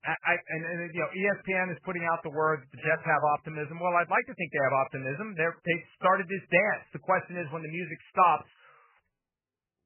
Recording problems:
garbled, watery; badly; nothing above 2.5 kHz

